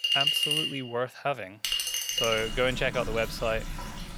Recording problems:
household noises; very loud; throughout; 2 dB above the speech

